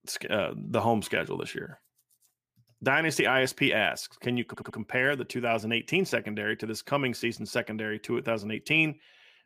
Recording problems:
audio stuttering; at 4.5 s

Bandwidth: 15 kHz